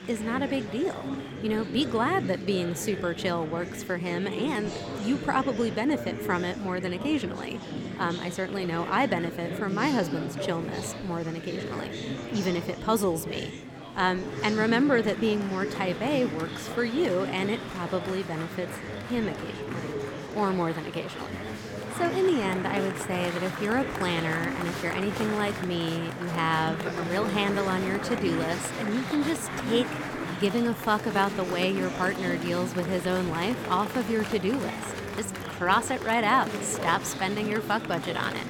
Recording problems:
murmuring crowd; loud; throughout; 6 dB below the speech

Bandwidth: 17 kHz